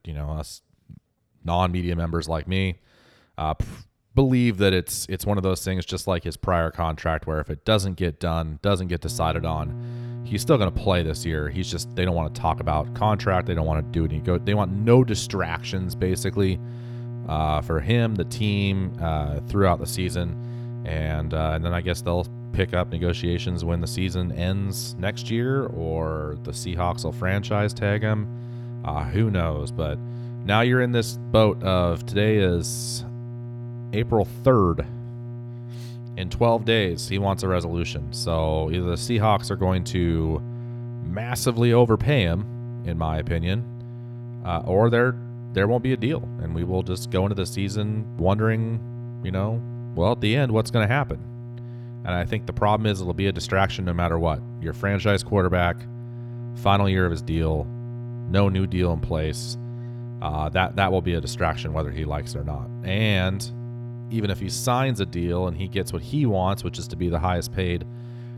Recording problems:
electrical hum; noticeable; from 9 s on; 60 Hz, 20 dB below the speech

